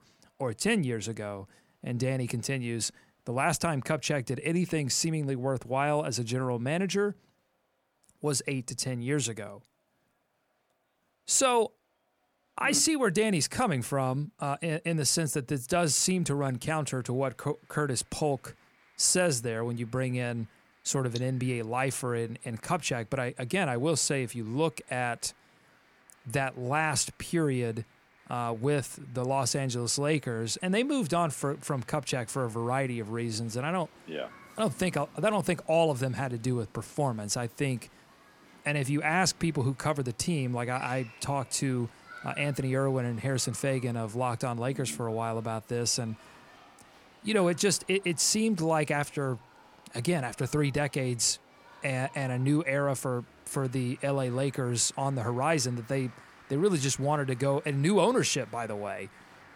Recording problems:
crowd noise; faint; throughout; 25 dB below the speech

